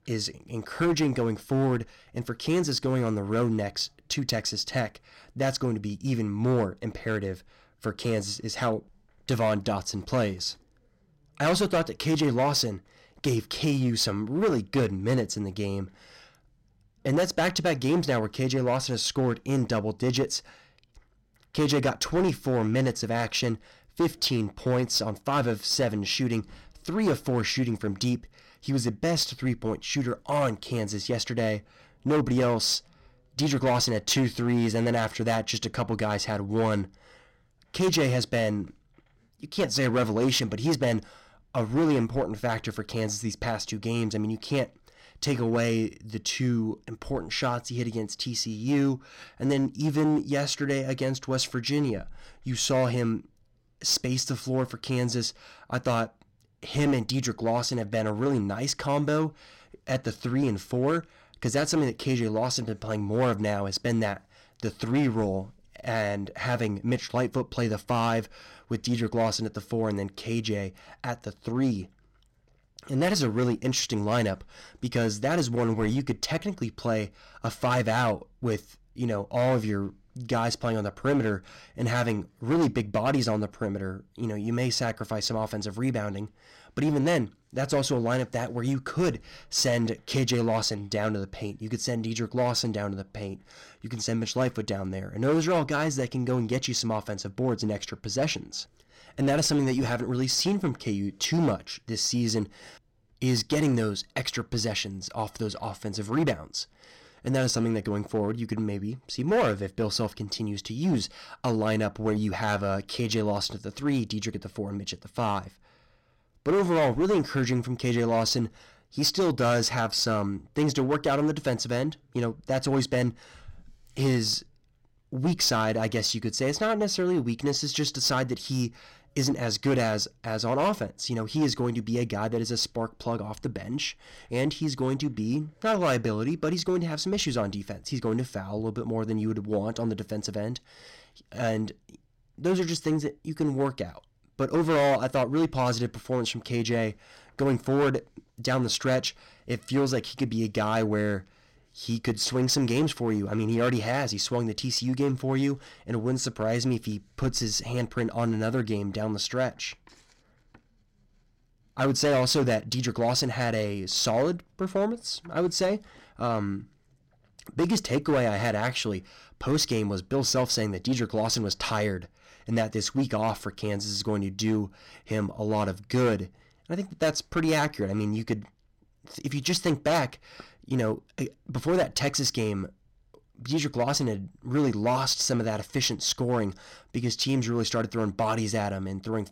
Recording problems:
distortion; slight; 6% of the sound clipped

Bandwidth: 16.5 kHz